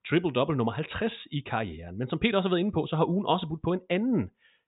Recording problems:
high frequencies cut off; severe; nothing above 4 kHz

